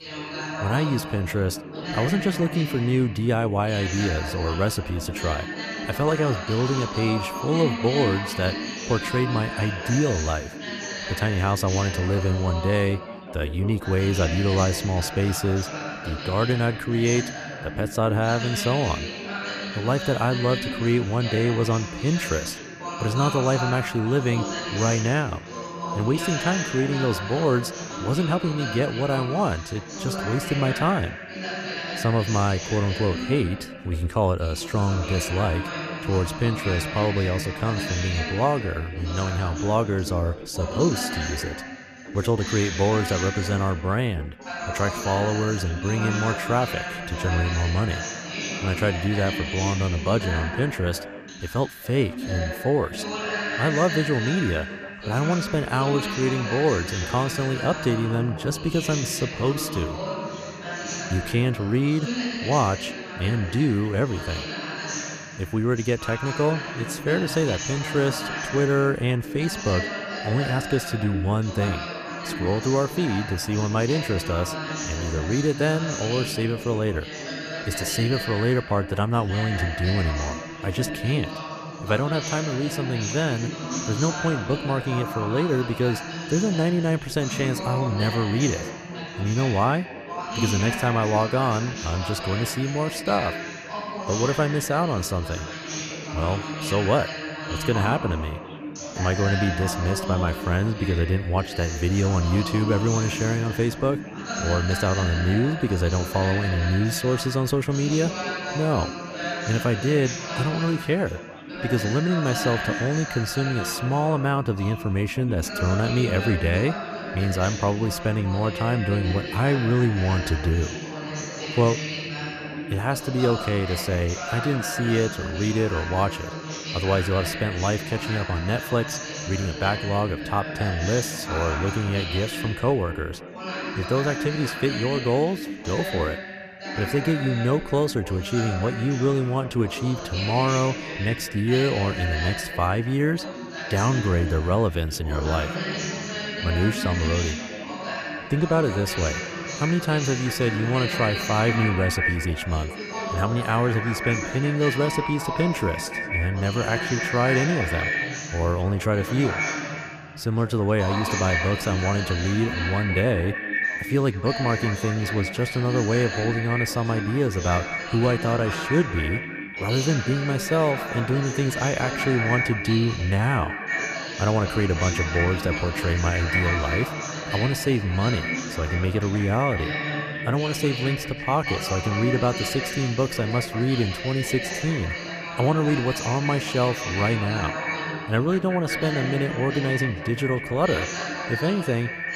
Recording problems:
echo of what is said; strong; from 2:28 on; 190 ms later, 7 dB below the speech
background chatter; loud; throughout; 3 voices, 6 dB below the speech

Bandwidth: 14.5 kHz